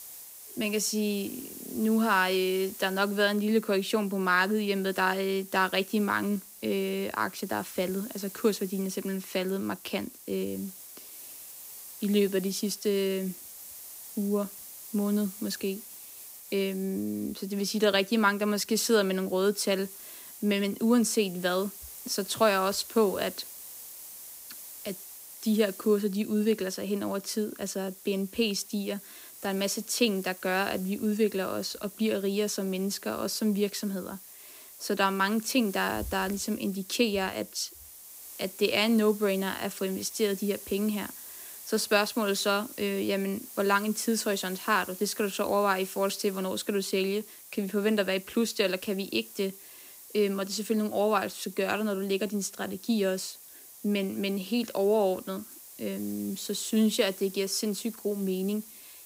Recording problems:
hiss; noticeable; throughout; 15 dB below the speech

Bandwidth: 15.5 kHz